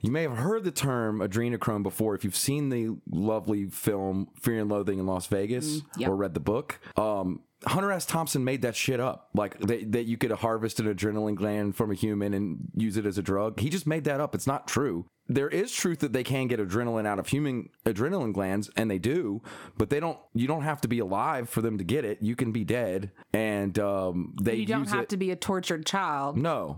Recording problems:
squashed, flat; somewhat

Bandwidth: 18 kHz